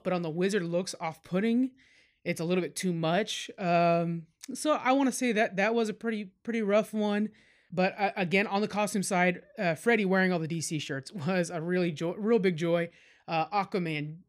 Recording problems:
none

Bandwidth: 15 kHz